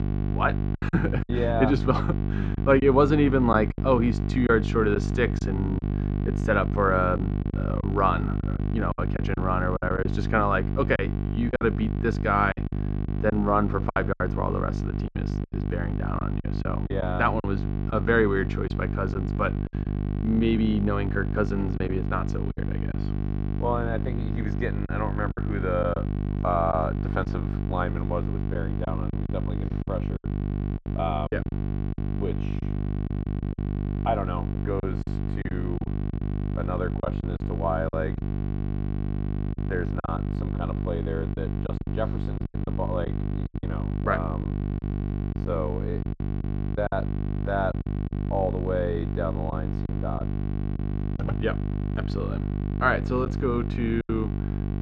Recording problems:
muffled; very; fading above 2 kHz
electrical hum; loud; throughout; 50 Hz, 10 dB below the speech
choppy; very; 7% of the speech affected

